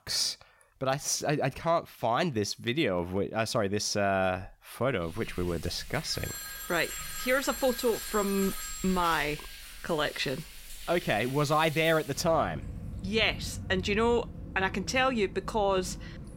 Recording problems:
rain or running water; noticeable; from 5 s on; 15 dB below the speech
phone ringing; noticeable; from 6 to 9.5 s; peak 8 dB below the speech

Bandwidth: 16 kHz